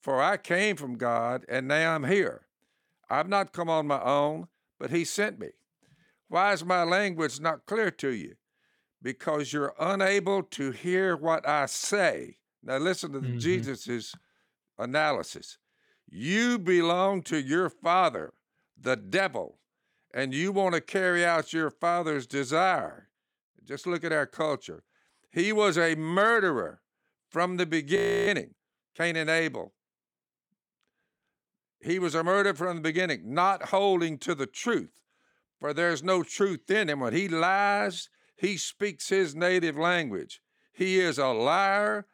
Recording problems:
audio freezing; at 28 s

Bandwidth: 18 kHz